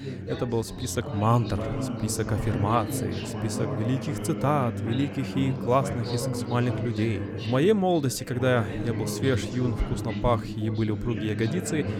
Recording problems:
background chatter; loud; throughout; 3 voices, 5 dB below the speech

